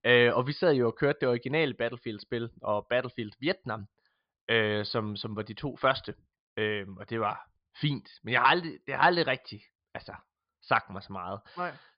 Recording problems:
high frequencies cut off; severe; nothing above 5 kHz

